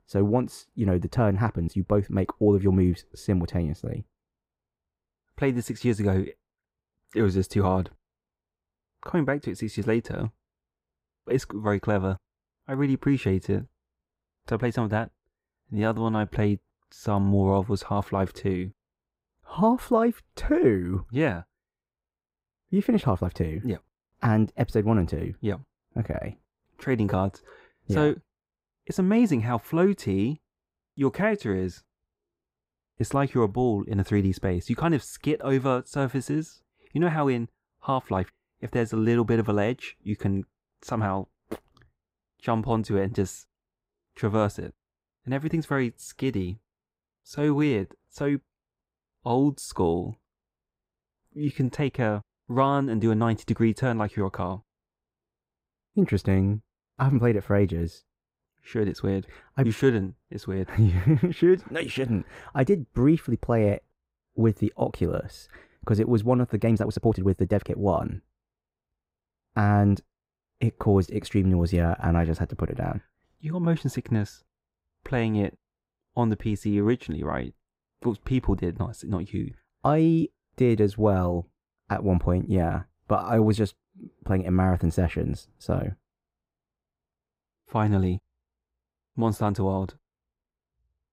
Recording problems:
muffled; slightly; fading above 2 kHz
uneven, jittery; strongly; from 1 s to 1:08

